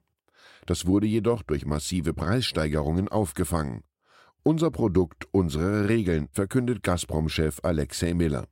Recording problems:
none

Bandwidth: 16 kHz